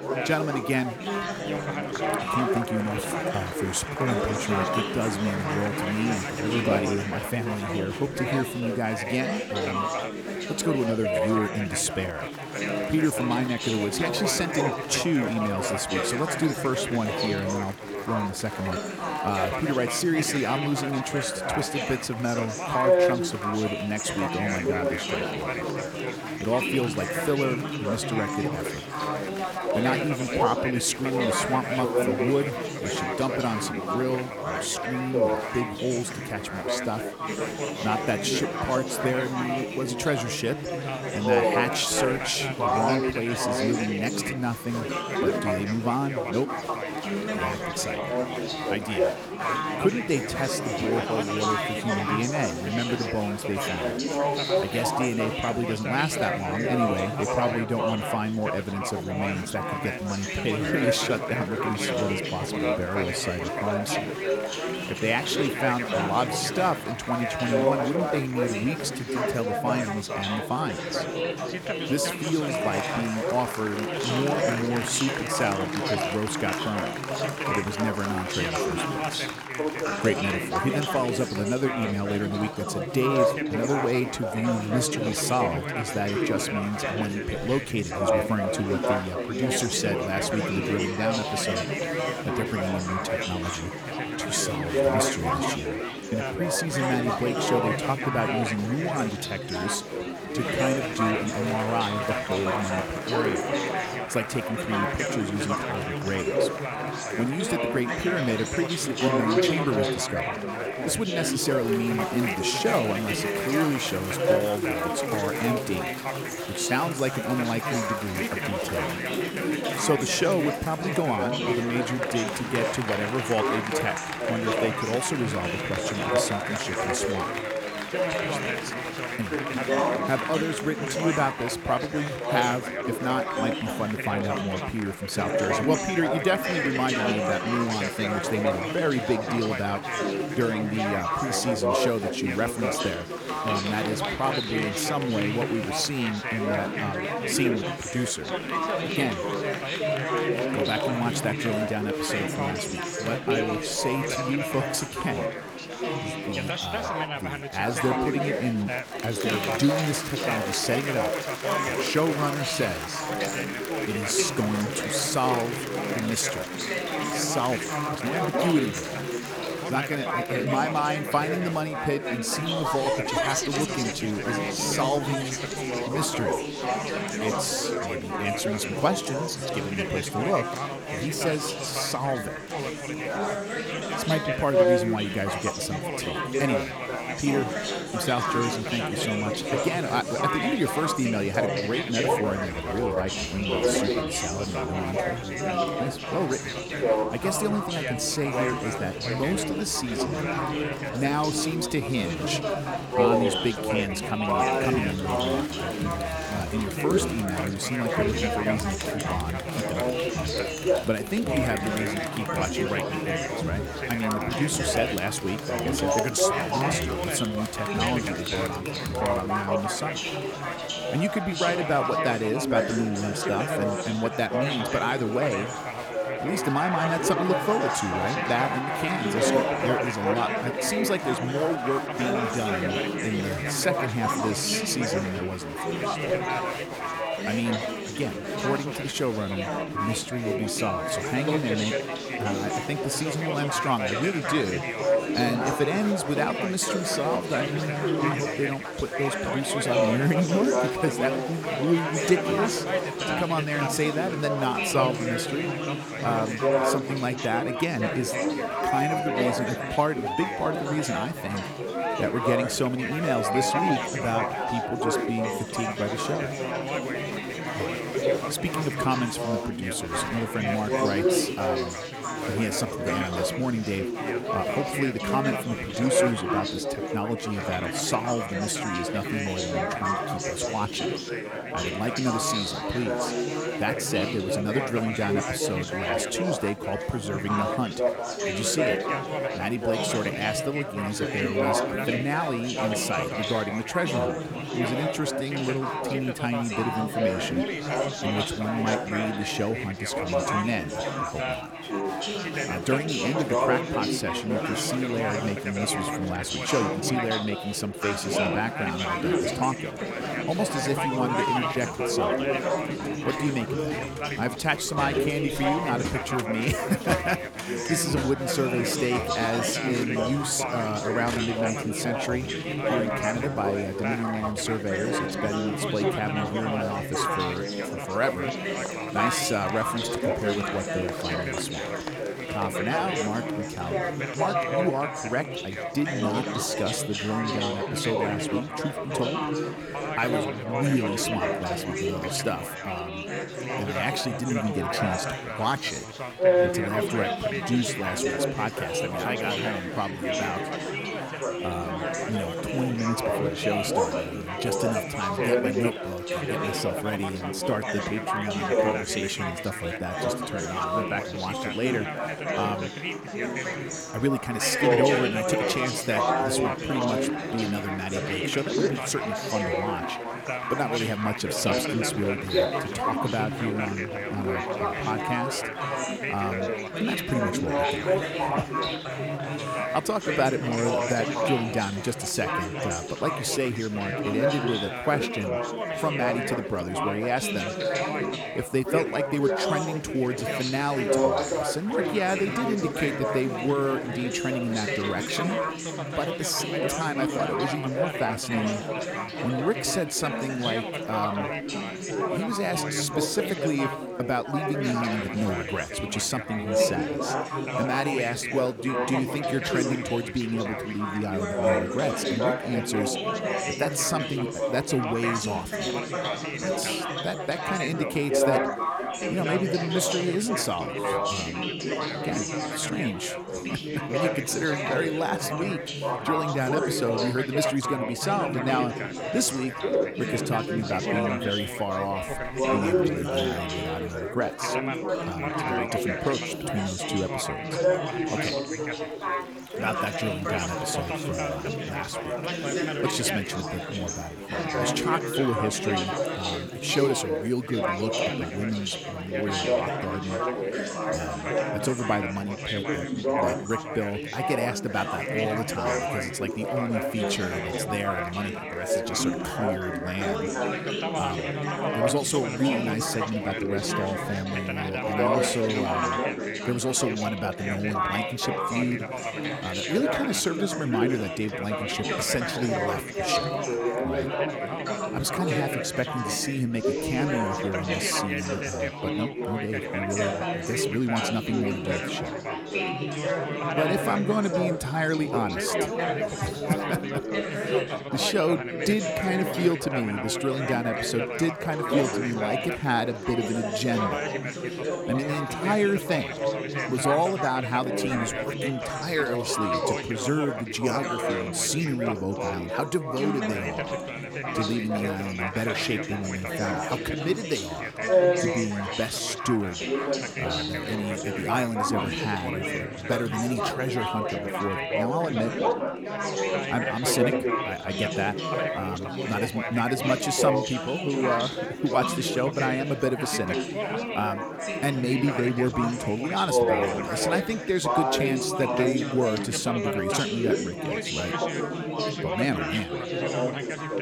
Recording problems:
chatter from many people; very loud; throughout; 1 dB above the speech

